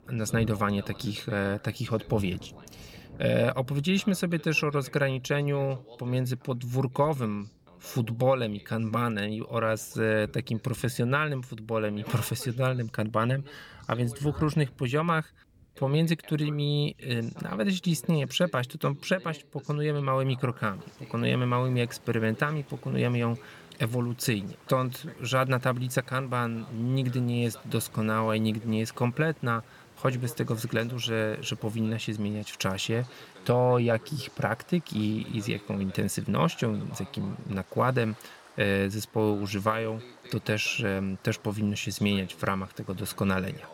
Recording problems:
rain or running water; faint; throughout; 25 dB below the speech
voice in the background; faint; throughout; 25 dB below the speech

